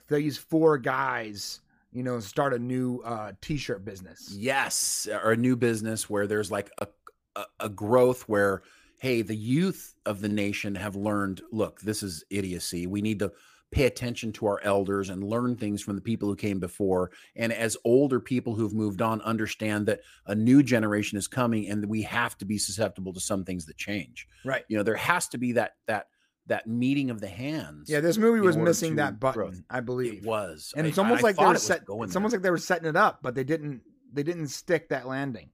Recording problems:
none

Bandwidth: 15 kHz